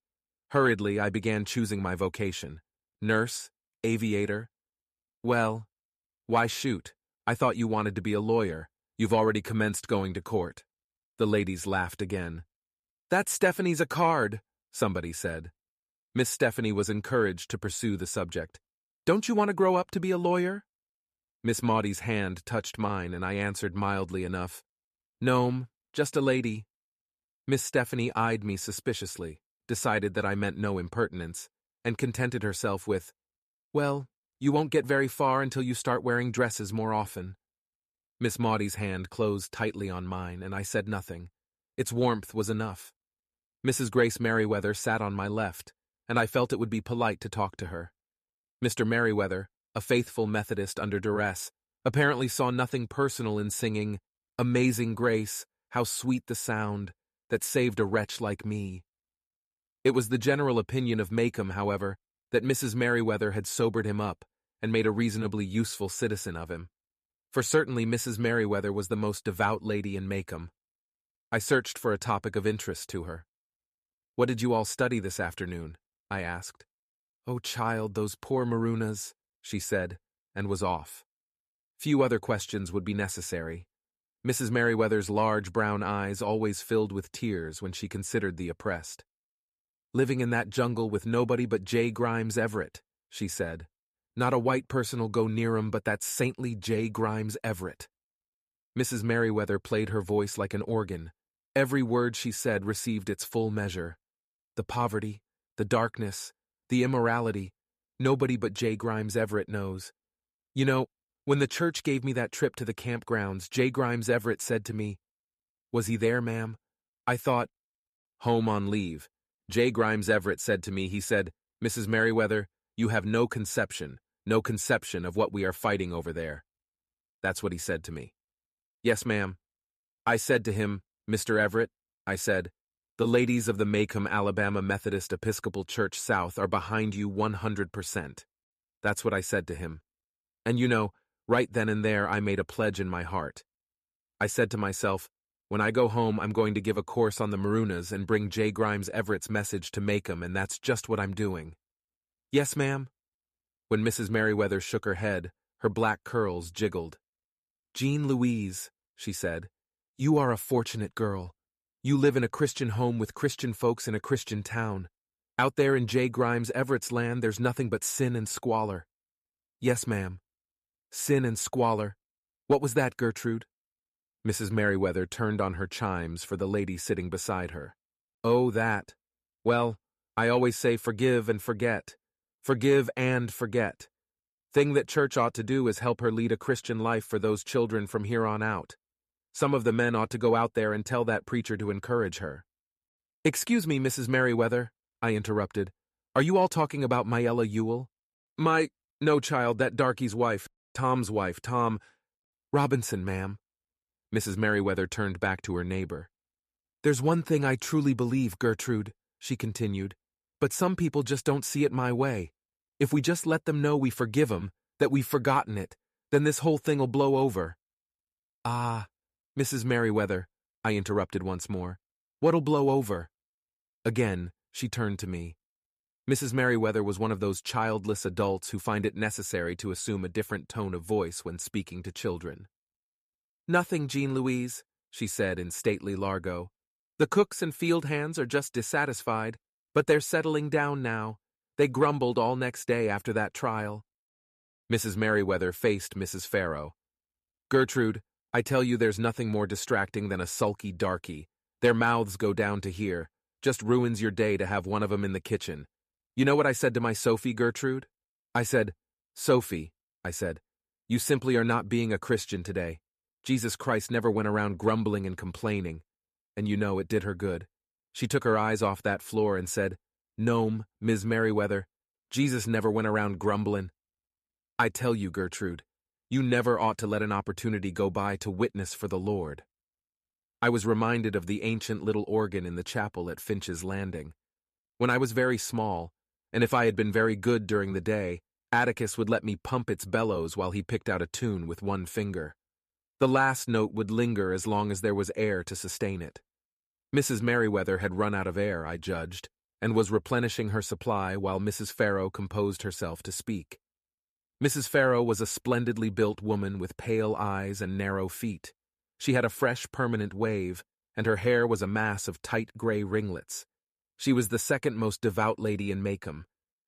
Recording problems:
none

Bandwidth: 14.5 kHz